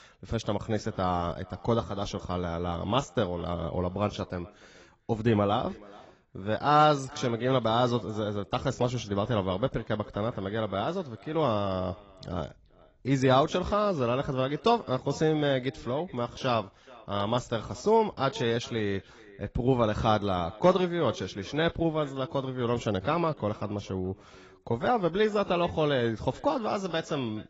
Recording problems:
garbled, watery; badly; nothing above 7.5 kHz
echo of what is said; faint; throughout; 430 ms later, 25 dB below the speech

